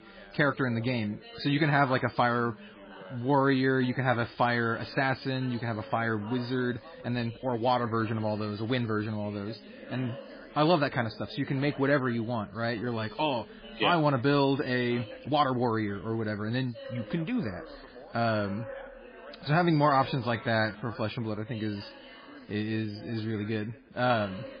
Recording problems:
garbled, watery; badly; nothing above 4.5 kHz
background chatter; noticeable; throughout; 2 voices, 20 dB below the speech
uneven, jittery; strongly; from 3 to 23 s

